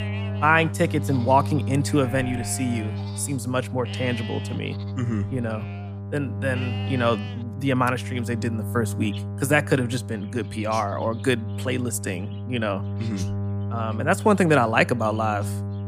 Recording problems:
electrical hum; noticeable; throughout; 50 Hz, 15 dB below the speech
animal sounds; noticeable; throughout; 15 dB below the speech

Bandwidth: 15 kHz